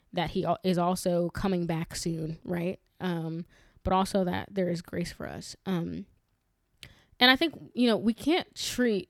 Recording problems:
none

